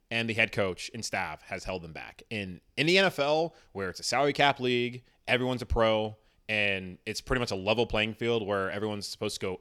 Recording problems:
none

